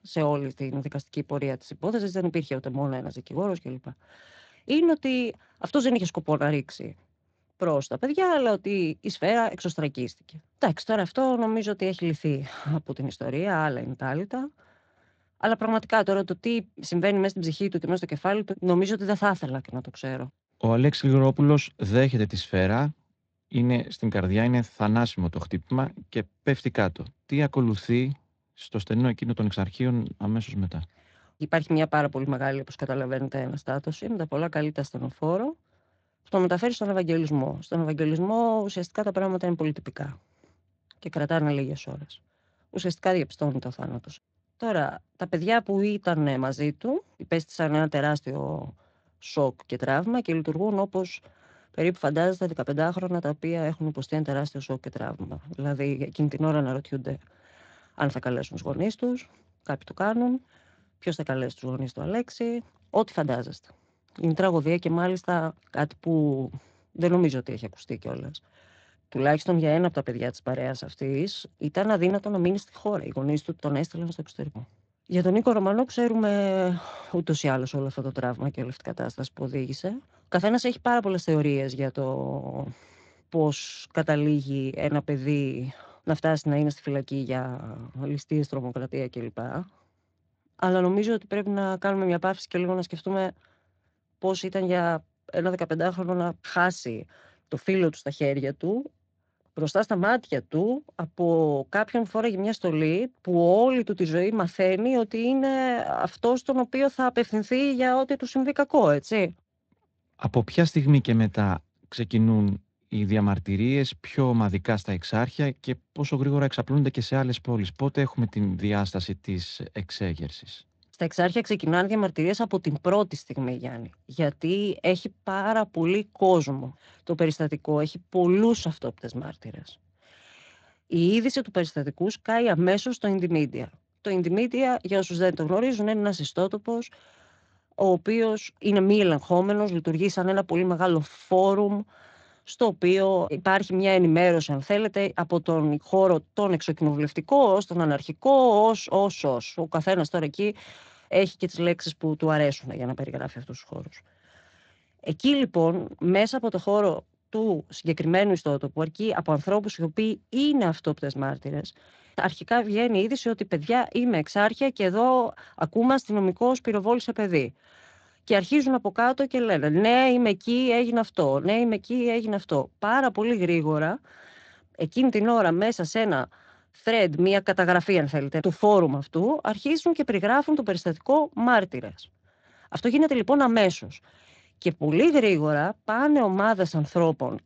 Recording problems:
garbled, watery; slightly; nothing above 7.5 kHz

